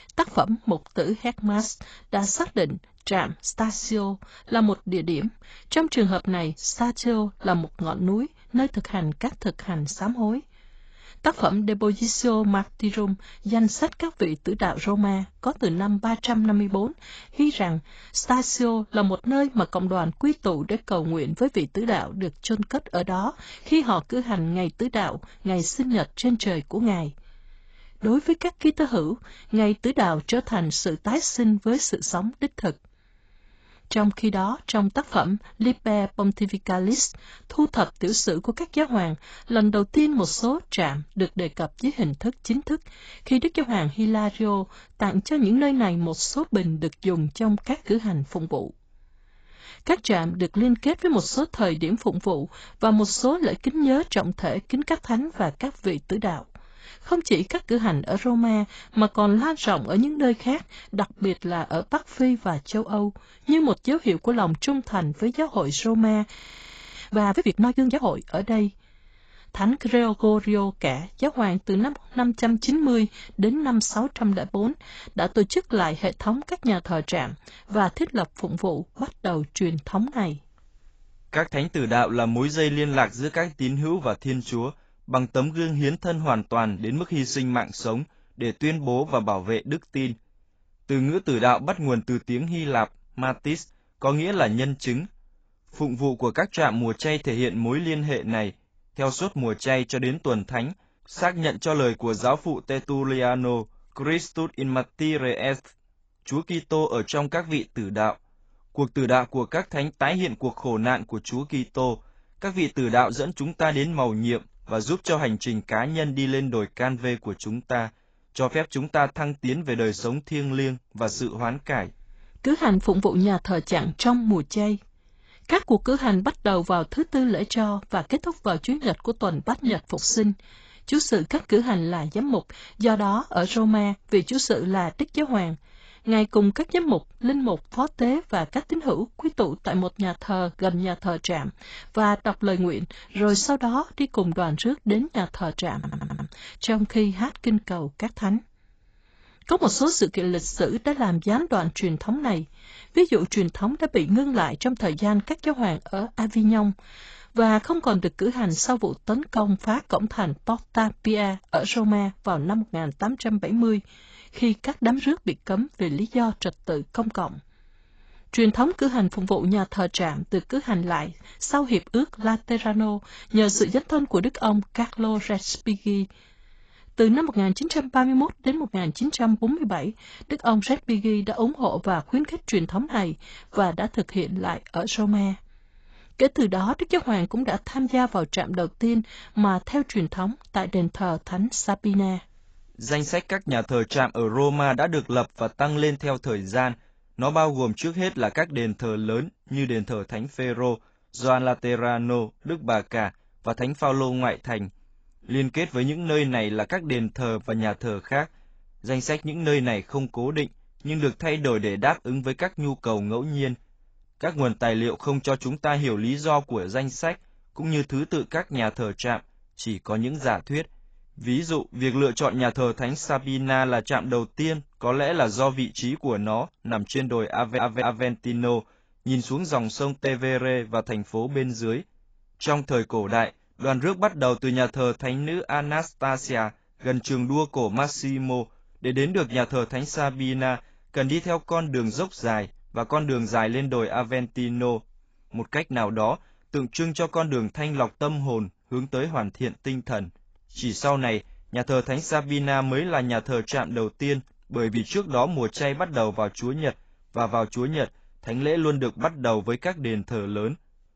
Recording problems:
garbled, watery; badly; nothing above 7.5 kHz
audio freezing; at 1:06 for 0.5 s
audio stuttering; at 2:26 and at 3:47

